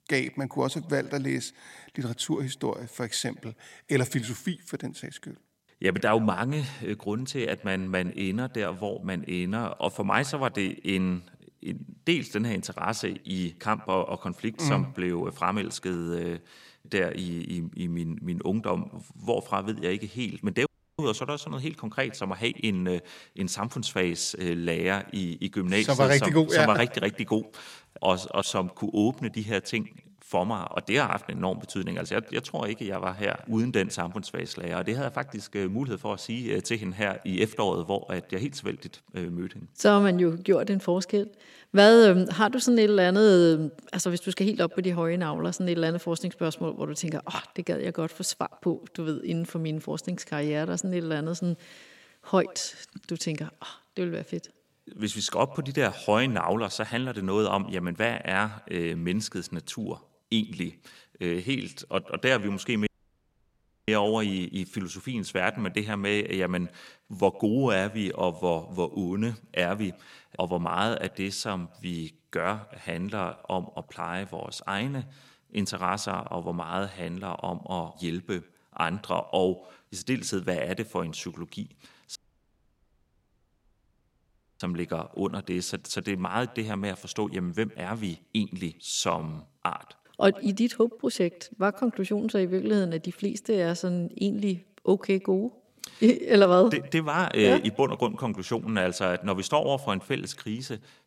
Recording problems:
echo of what is said; faint; throughout; 110 ms later, 25 dB below the speech
audio cutting out; at 21 s, at 1:03 for 1 s and at 1:22 for 2.5 s

